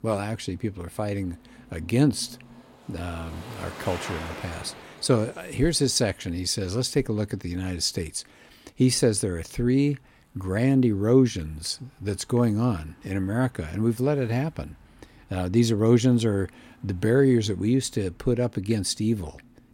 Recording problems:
traffic noise; noticeable; throughout; 20 dB below the speech

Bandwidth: 16.5 kHz